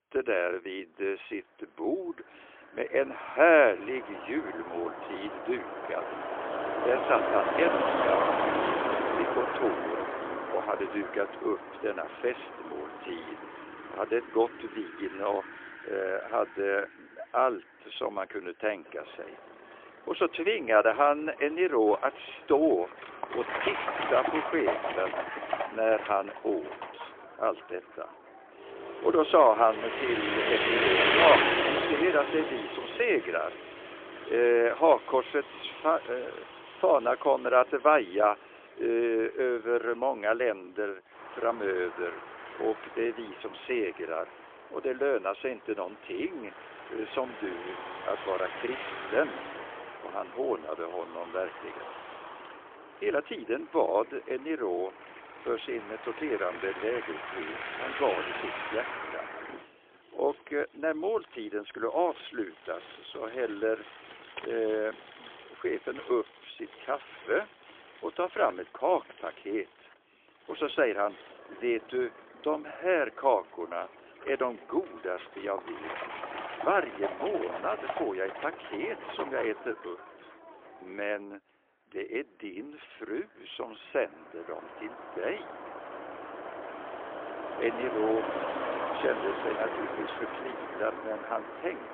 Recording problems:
phone-call audio; poor line; nothing above 3.5 kHz
traffic noise; loud; throughout; 4 dB below the speech

